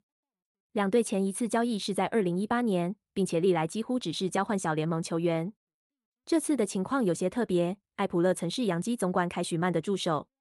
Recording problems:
none

